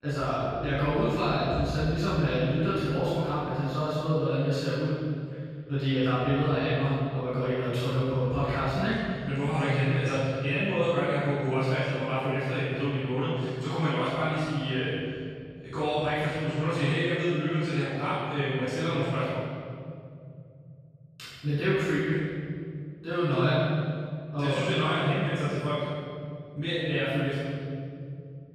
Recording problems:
room echo; strong; dies away in 2.7 s
off-mic speech; far

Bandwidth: 14 kHz